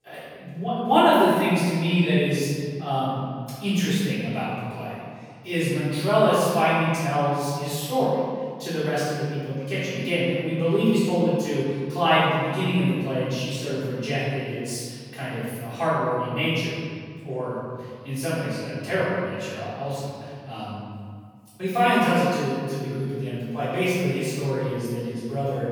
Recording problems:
room echo; strong; dies away in 1.8 s
off-mic speech; far

